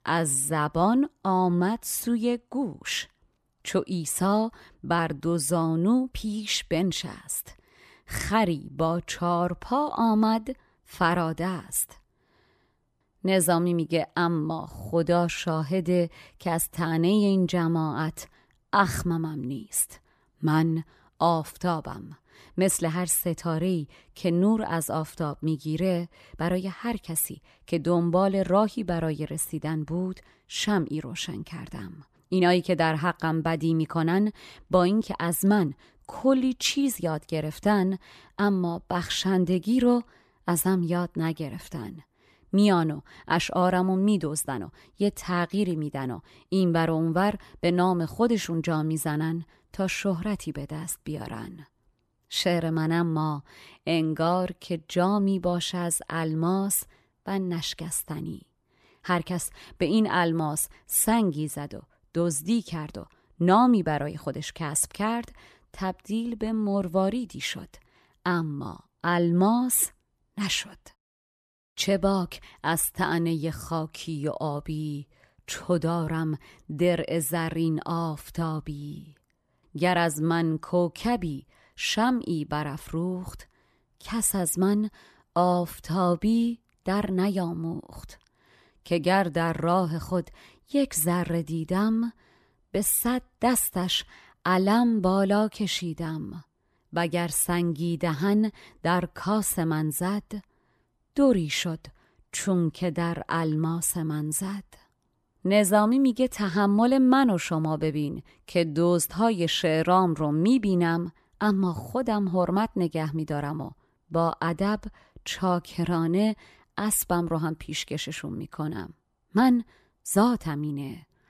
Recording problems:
none

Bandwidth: 14.5 kHz